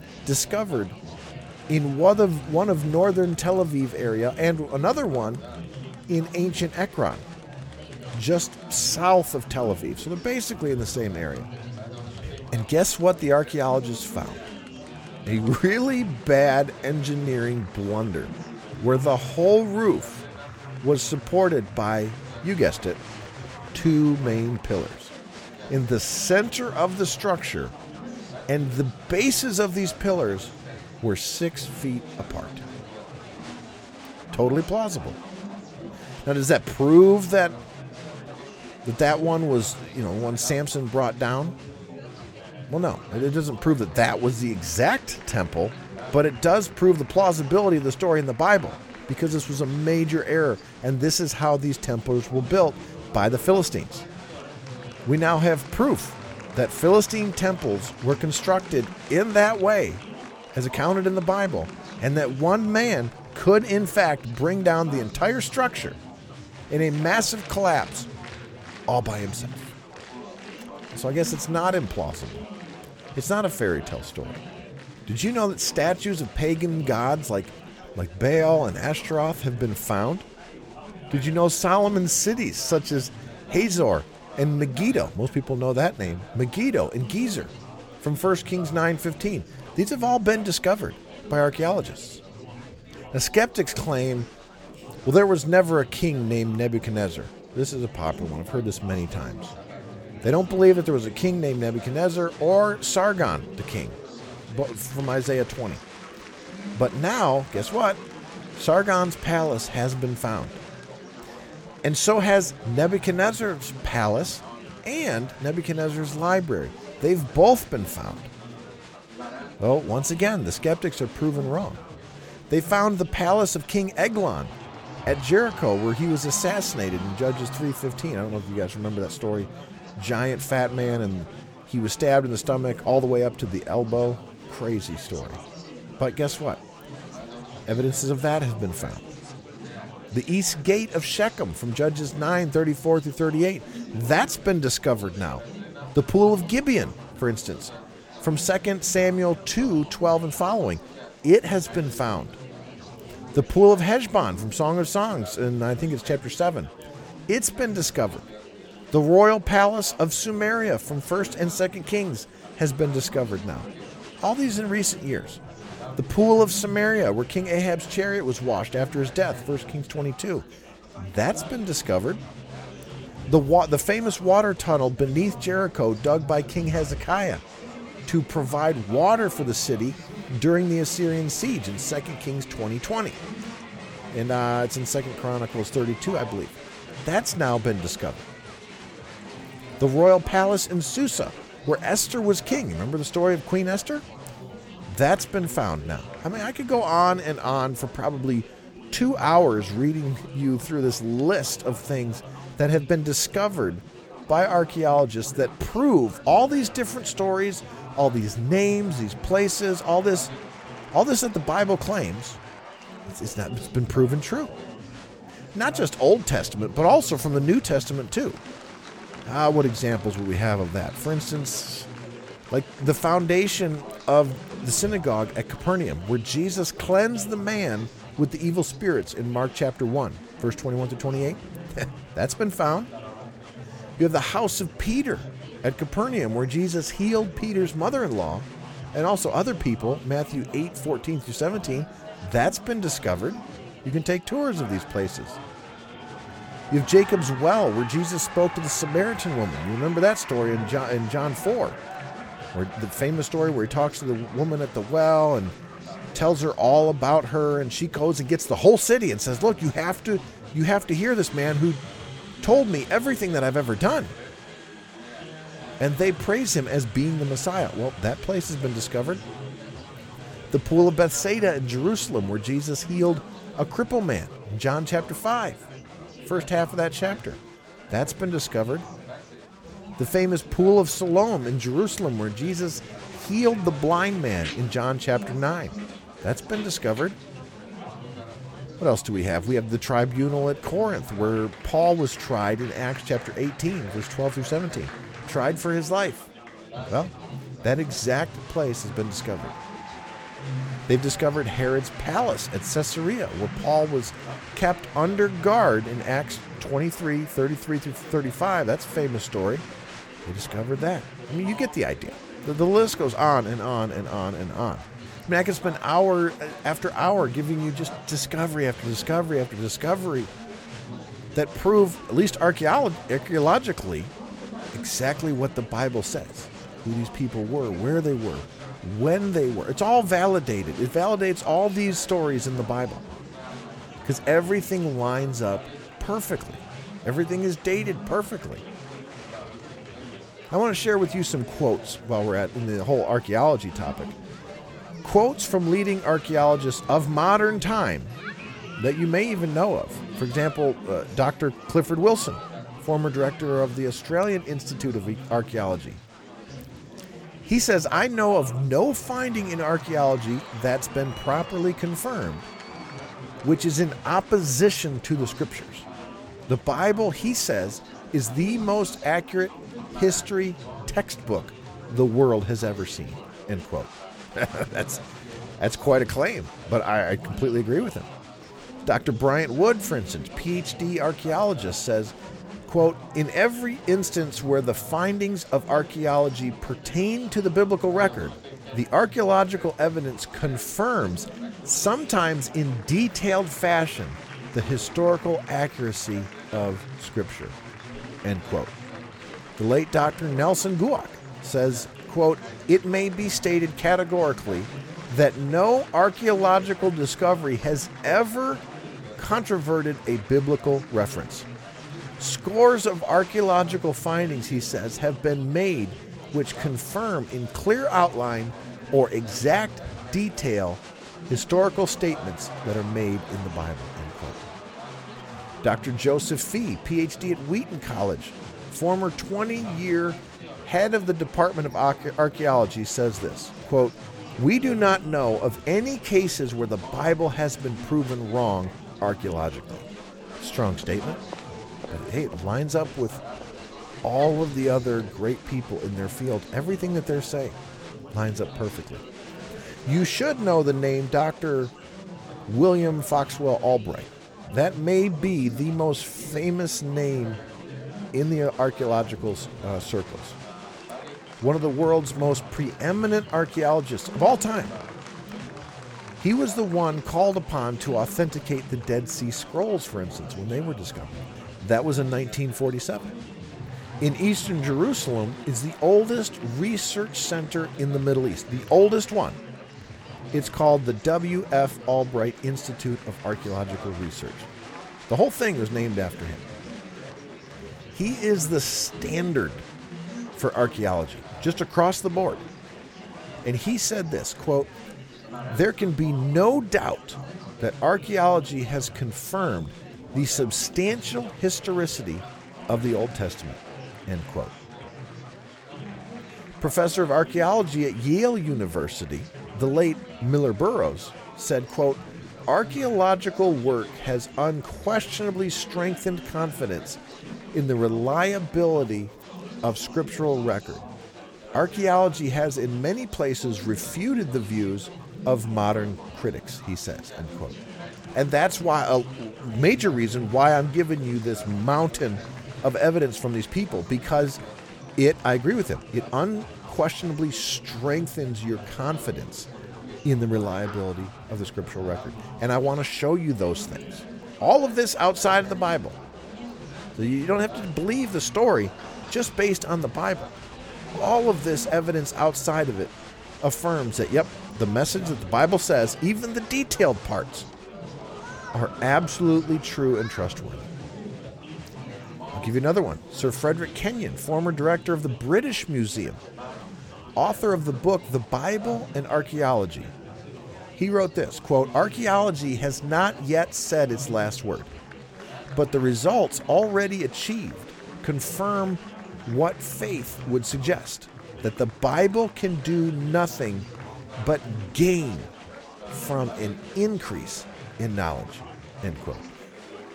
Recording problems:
chatter from many people; noticeable; throughout; 15 dB below the speech

